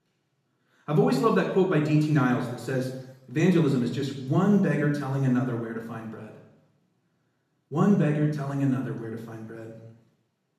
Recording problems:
off-mic speech; far
room echo; noticeable; dies away in 0.9 s

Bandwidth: 14 kHz